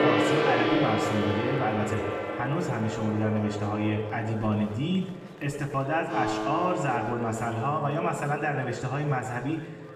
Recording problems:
room echo; slight; dies away in 1.1 s
off-mic speech; somewhat distant
background music; loud; throughout; 2 dB below the speech
murmuring crowd; faint; throughout; 20 dB below the speech

